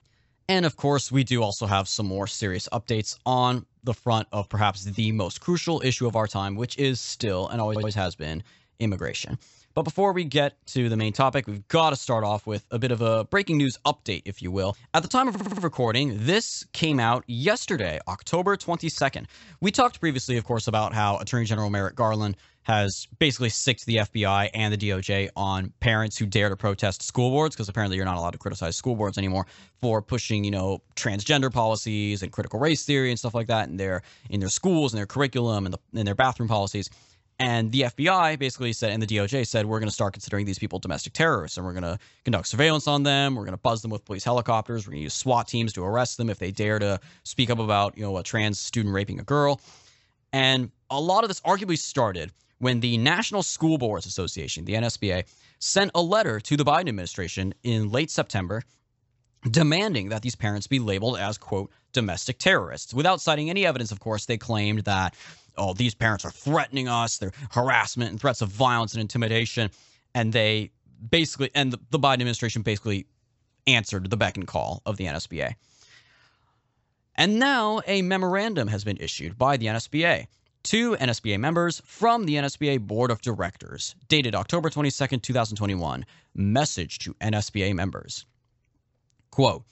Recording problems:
high frequencies cut off; noticeable; nothing above 7.5 kHz
audio stuttering; at 7.5 s and at 15 s

